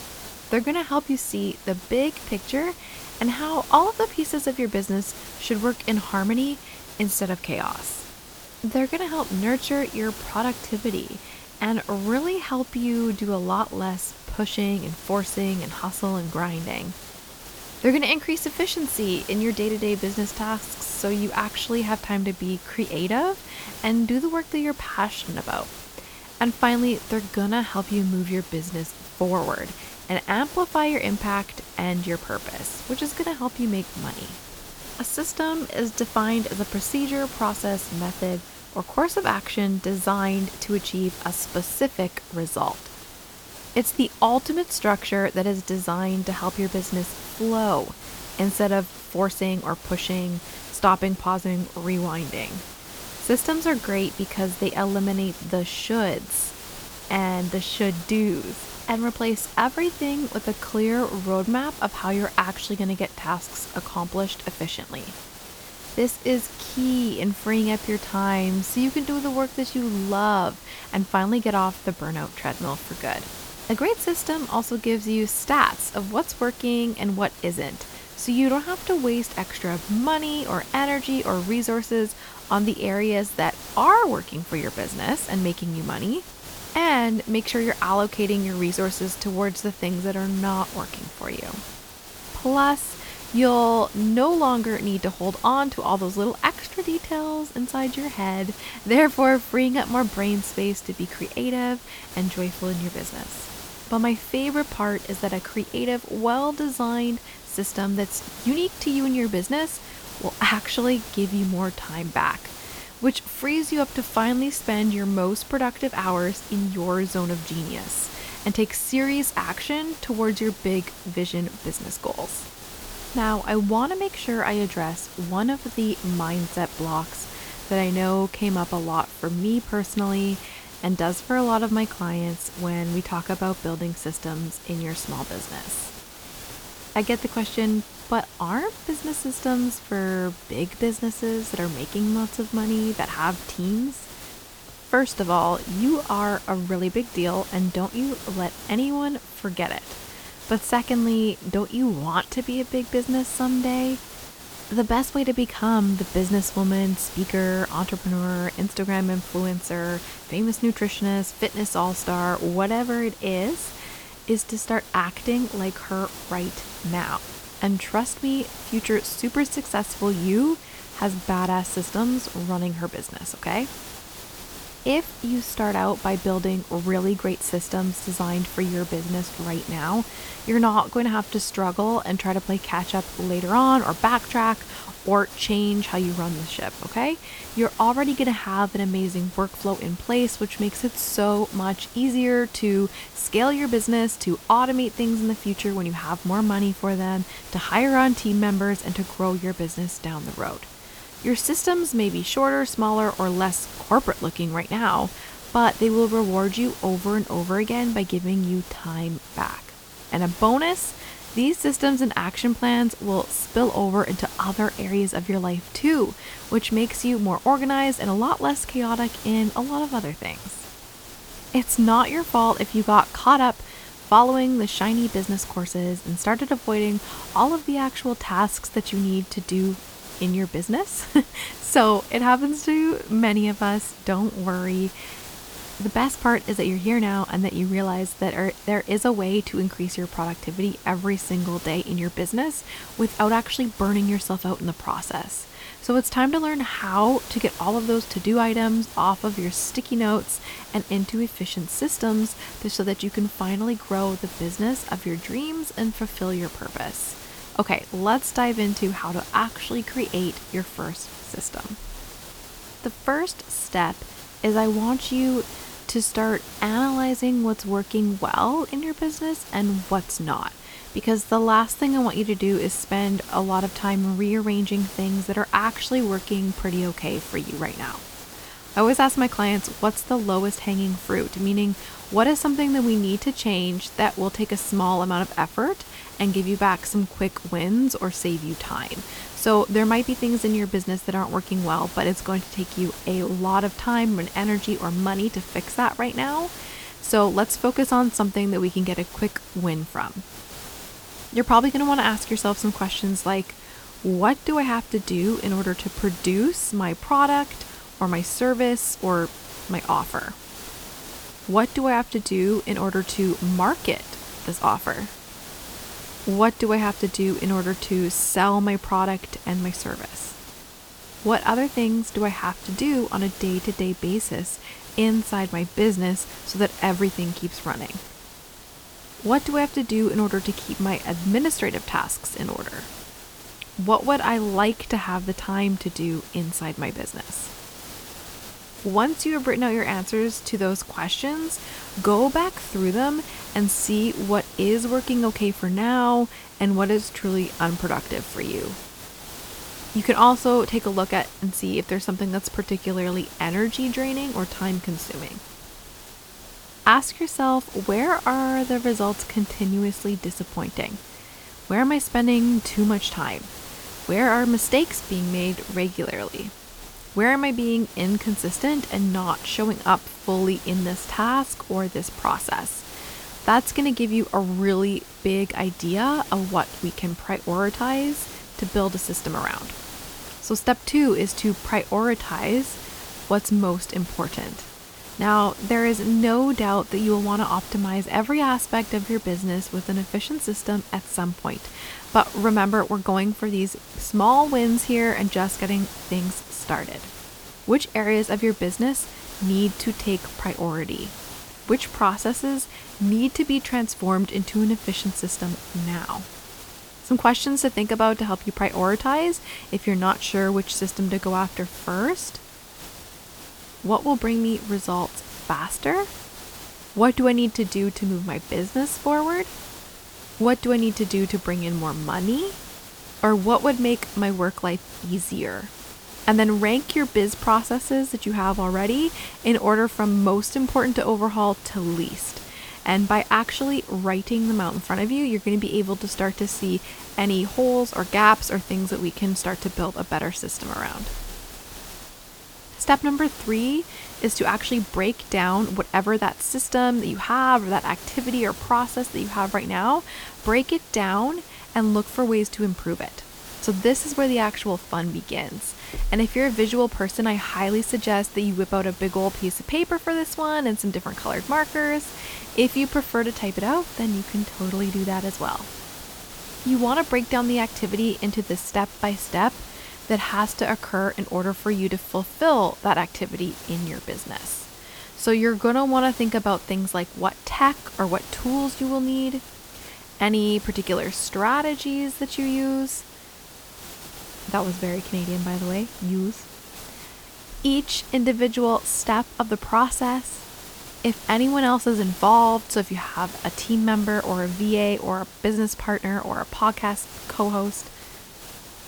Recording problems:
hiss; noticeable; throughout; 15 dB below the speech

